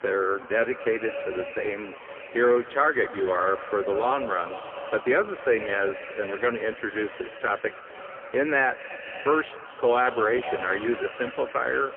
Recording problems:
phone-call audio; poor line
echo of what is said; noticeable; throughout; 220 ms later, 10 dB below the speech
traffic noise; faint; throughout; 30 dB below the speech
murmuring crowd; faint; throughout; 25 dB below the speech

